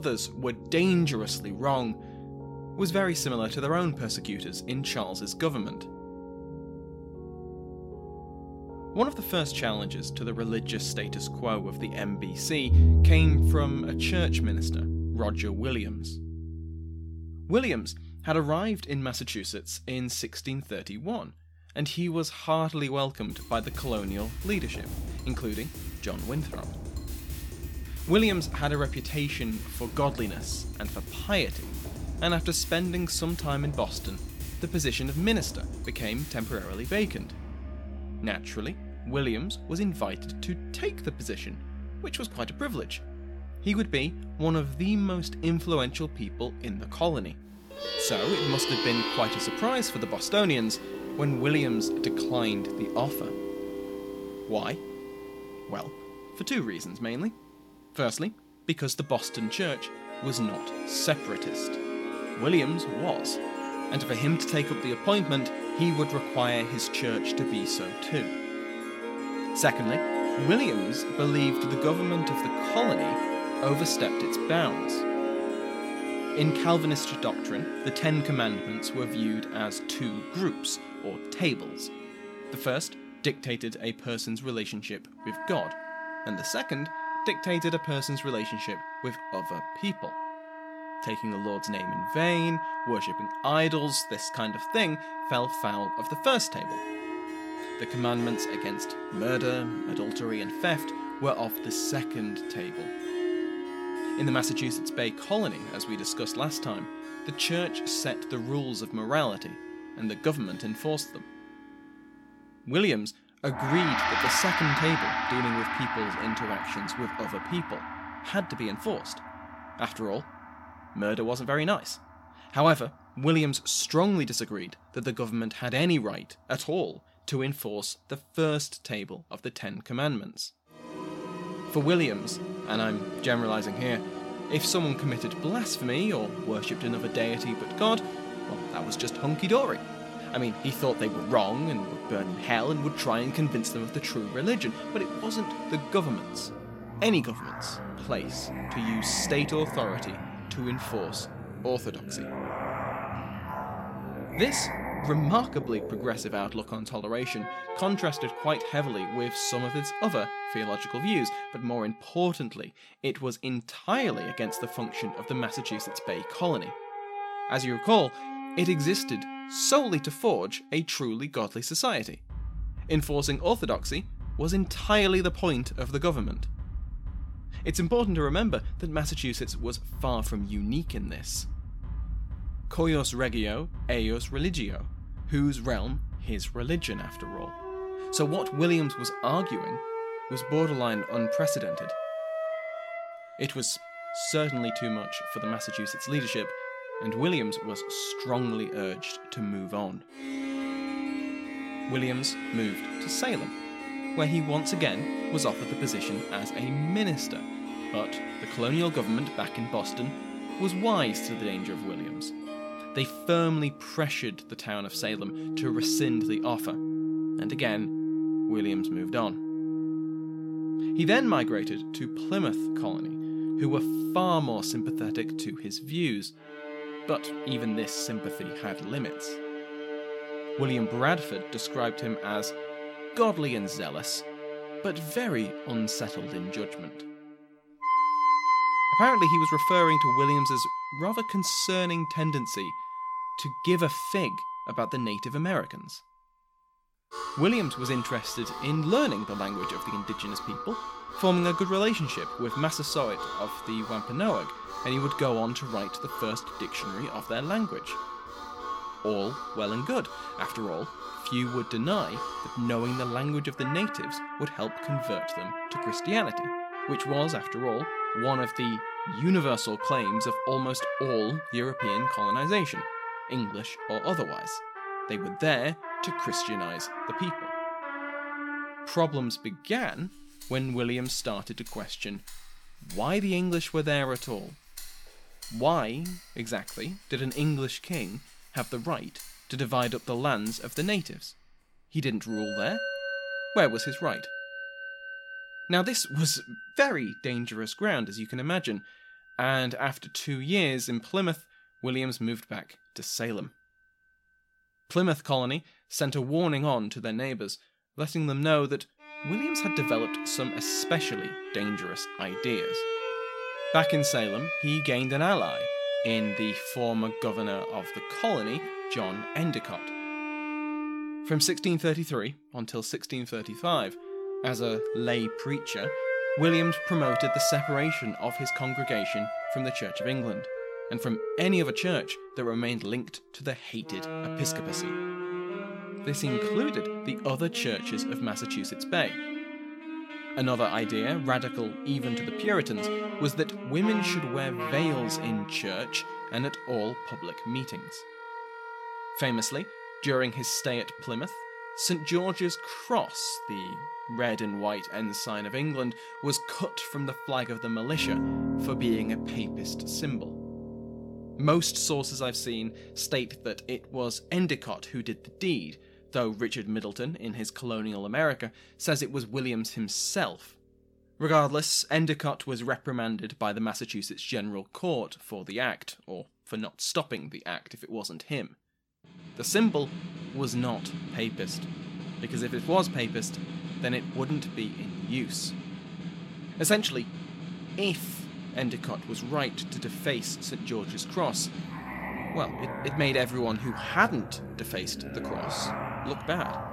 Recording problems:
background music; loud; throughout; 4 dB below the speech
abrupt cut into speech; at the start

